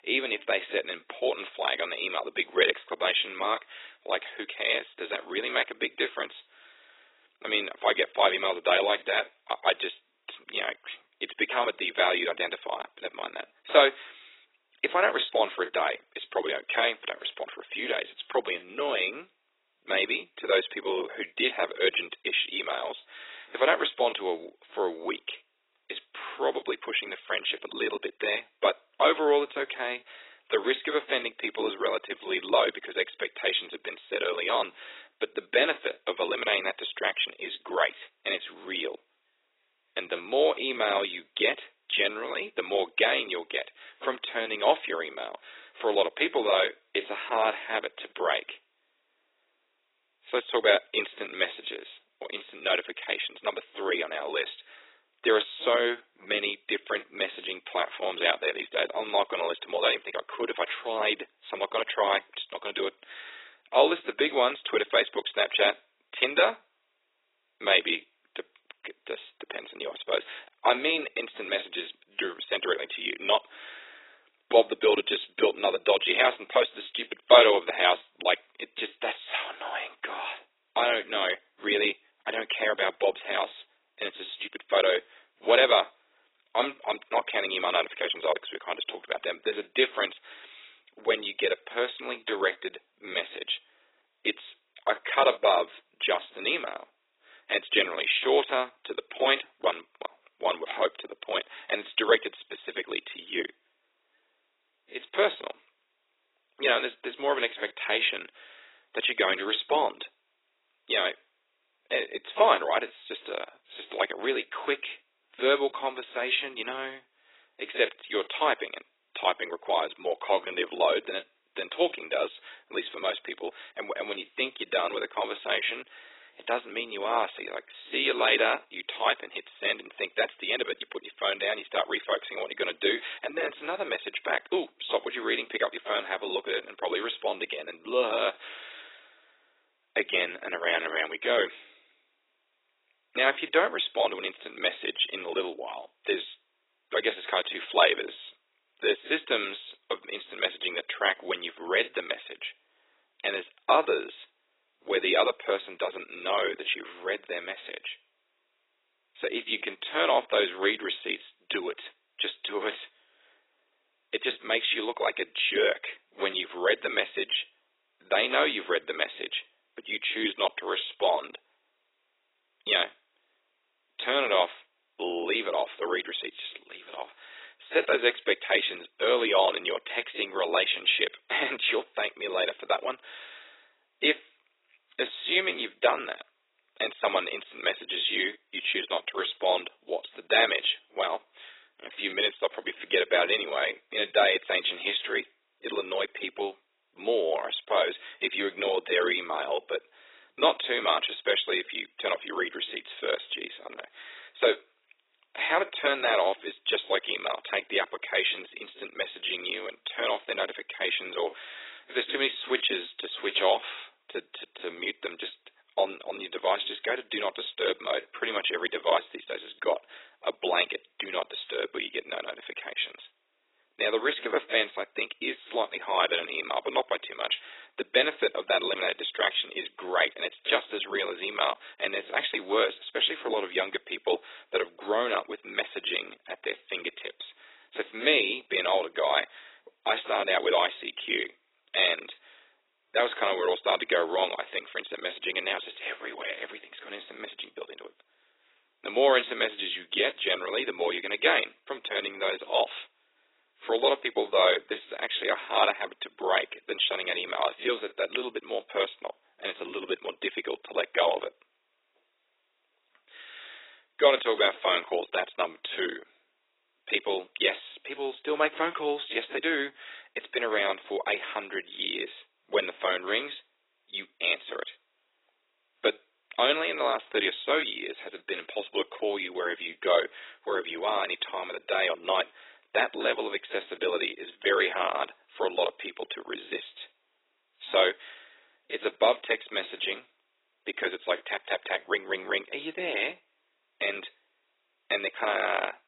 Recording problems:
garbled, watery; badly; nothing above 4 kHz
thin; very; fading below 350 Hz

